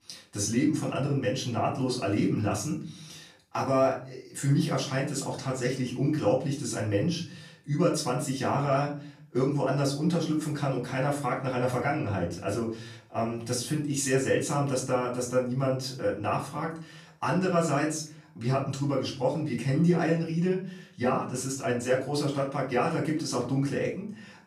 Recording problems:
off-mic speech; far
room echo; slight; dies away in 0.4 s

